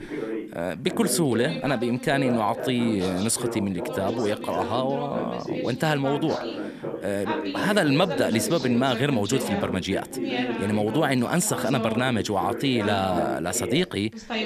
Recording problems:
background chatter; loud; throughout; 2 voices, 6 dB below the speech

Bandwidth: 14 kHz